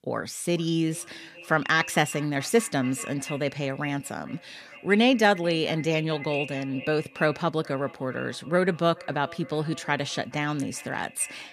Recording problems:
echo of what is said; noticeable; throughout; 430 ms later, 15 dB below the speech

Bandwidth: 14.5 kHz